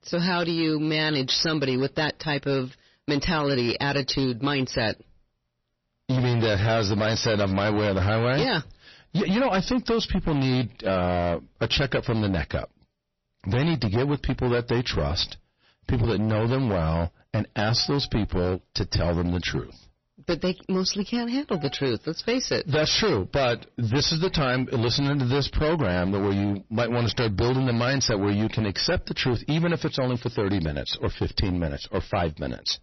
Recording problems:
distortion; heavy; 16% of the sound clipped
garbled, watery; slightly; nothing above 6 kHz

